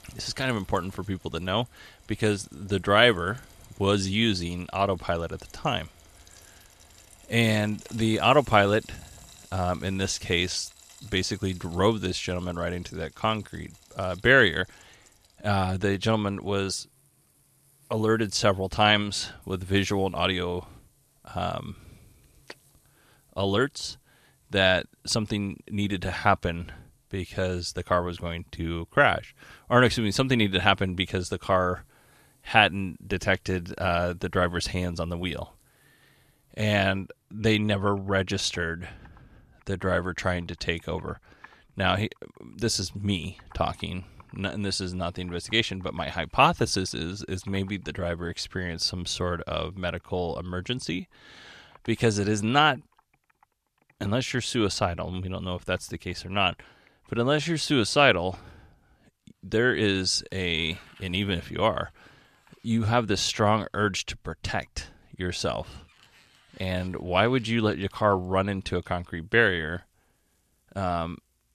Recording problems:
household noises; faint; throughout; 30 dB below the speech

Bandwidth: 14 kHz